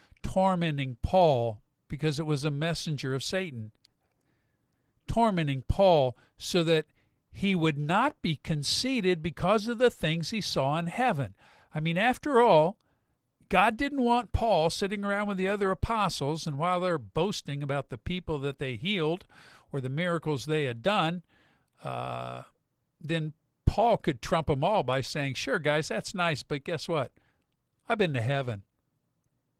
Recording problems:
garbled, watery; slightly

